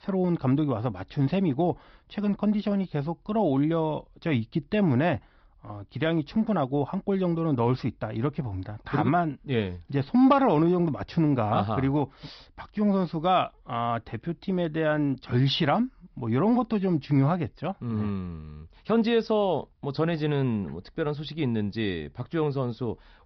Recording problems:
high frequencies cut off; noticeable; nothing above 5.5 kHz

